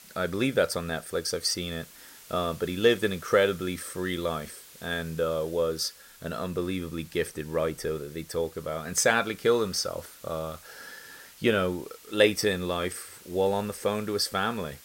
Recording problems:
hiss; faint; throughout; 20 dB below the speech

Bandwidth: 16 kHz